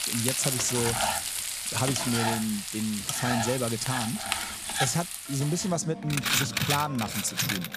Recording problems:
household noises; very loud; throughout; 1 dB above the speech

